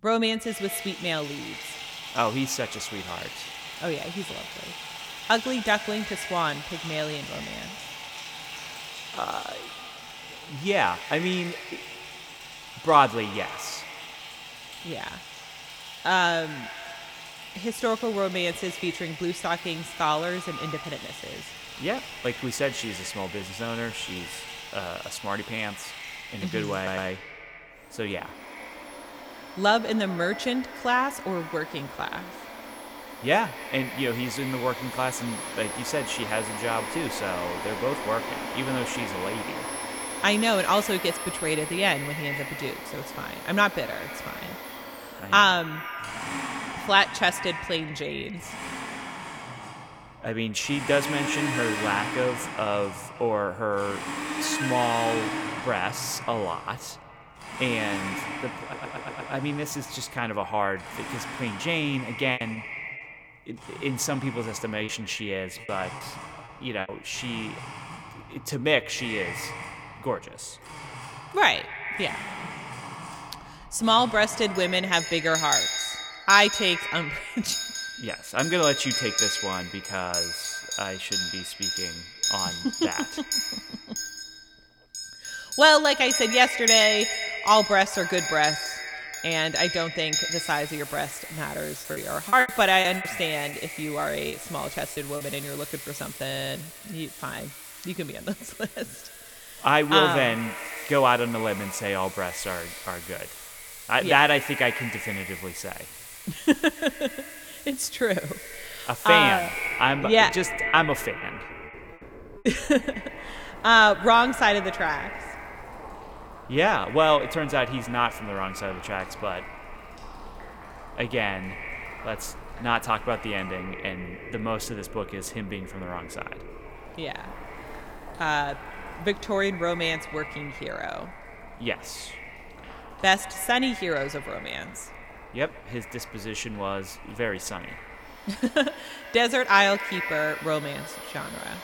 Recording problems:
echo of what is said; noticeable; throughout; 130 ms later, 15 dB below the speech
household noises; loud; throughout; 9 dB below the speech
audio stuttering; at 27 s, at 59 s and at 1:36
choppy; very; from 1:02 to 1:07, from 1:32 to 1:35 and at 1:51; 10% of the speech affected

